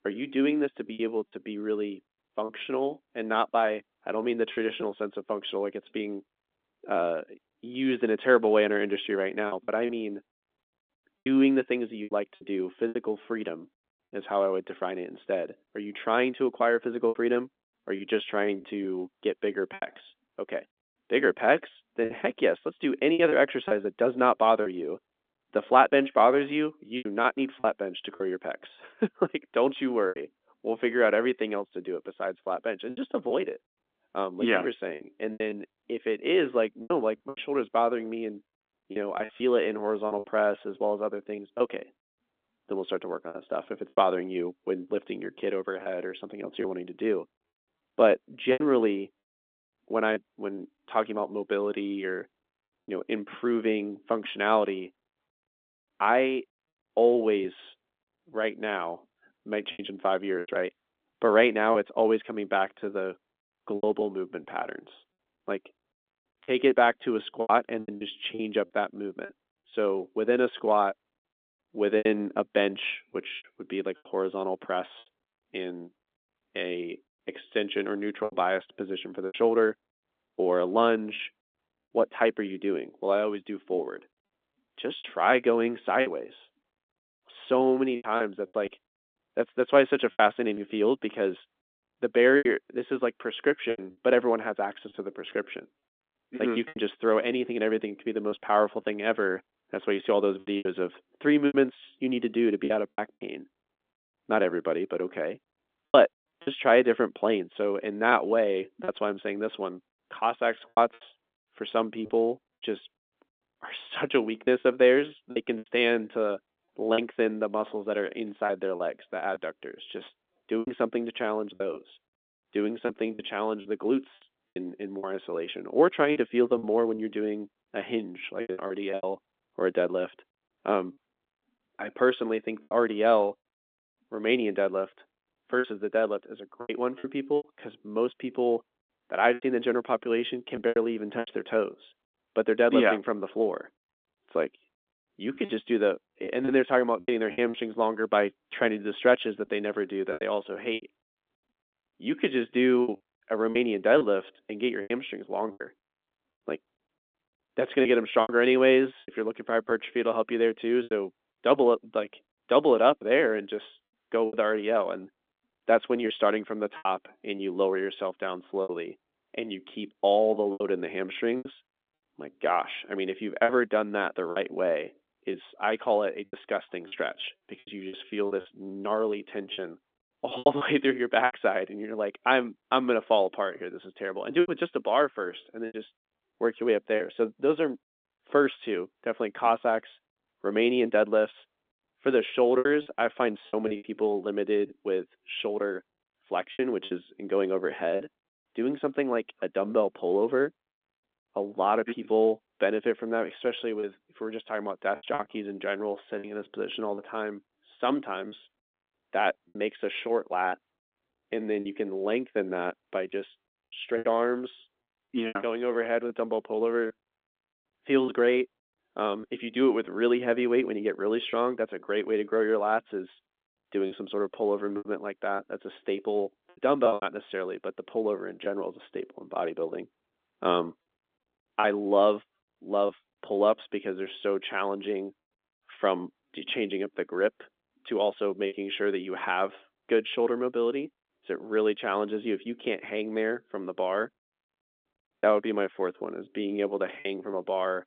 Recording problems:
phone-call audio; nothing above 3.5 kHz
choppy; very; 6% of the speech affected

